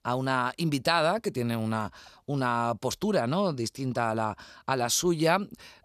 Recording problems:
none

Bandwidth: 14 kHz